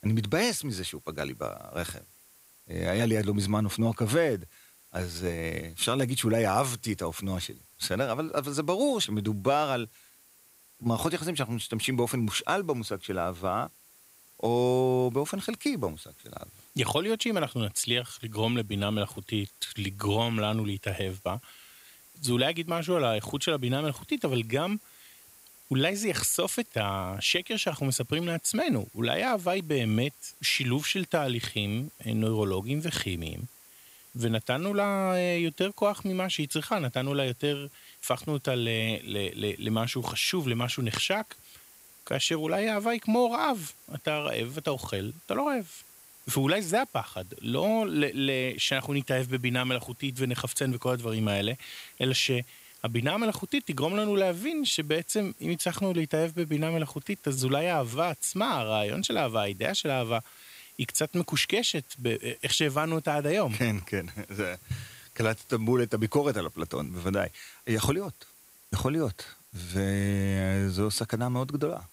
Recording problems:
hiss; faint; throughout; 25 dB below the speech

